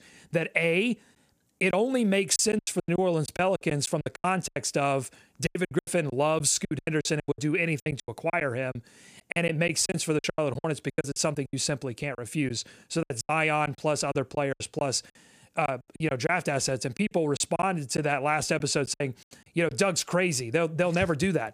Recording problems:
choppy; very; 14% of the speech affected

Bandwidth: 15 kHz